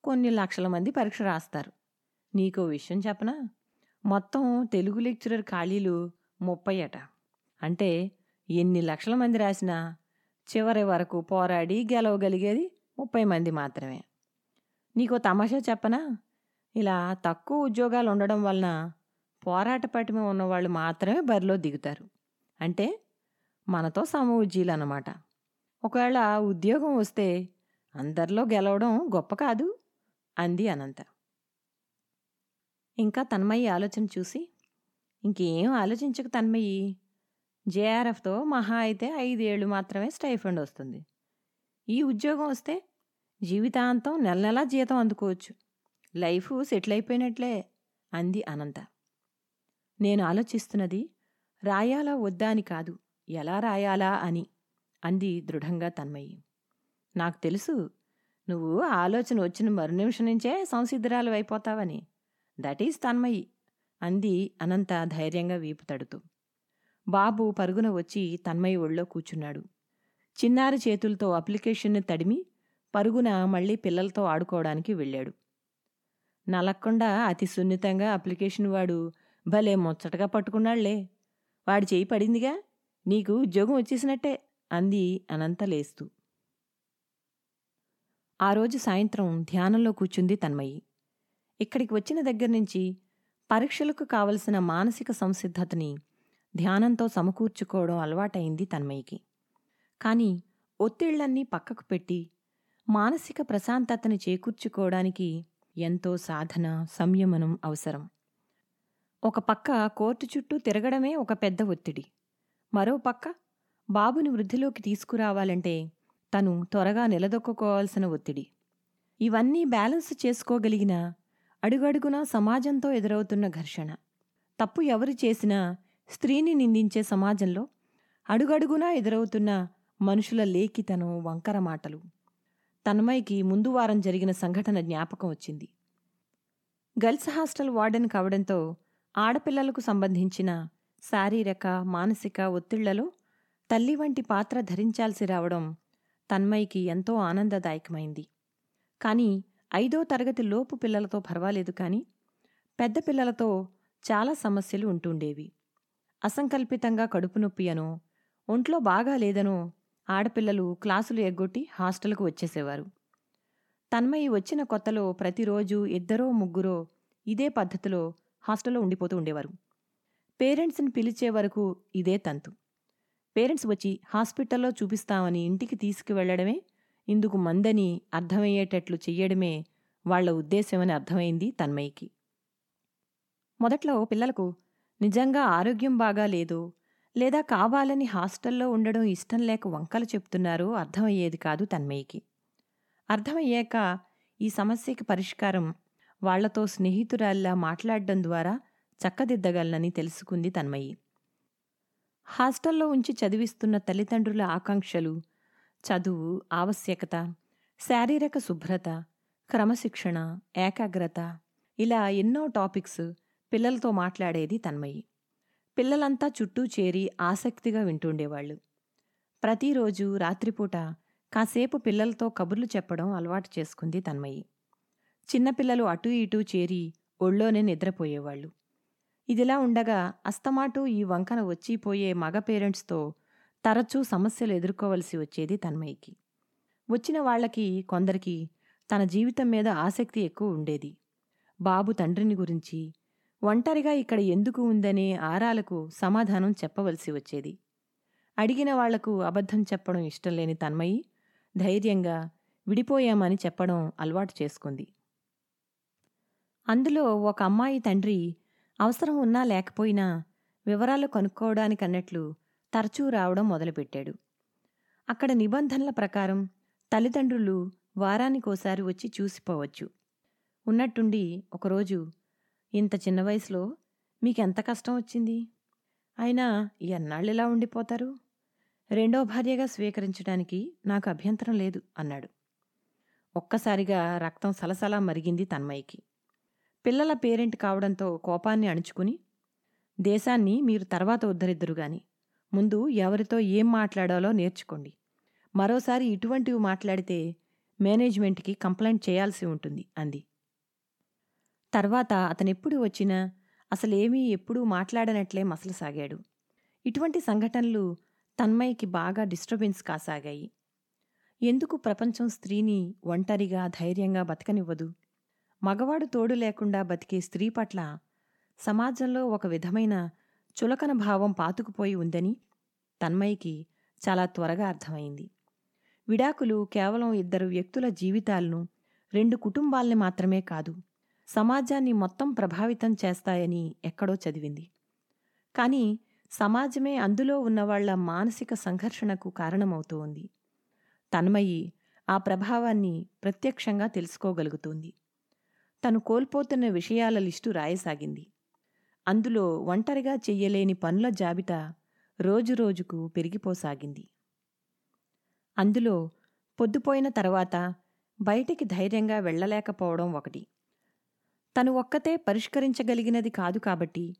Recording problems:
uneven, jittery; strongly; from 2:48 to 3:05

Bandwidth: 18 kHz